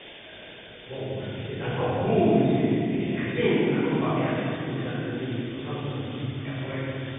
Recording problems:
room echo; strong; dies away in 3 s
off-mic speech; far
high frequencies cut off; severe; nothing above 3.5 kHz
hiss; noticeable; throughout; 15 dB below the speech

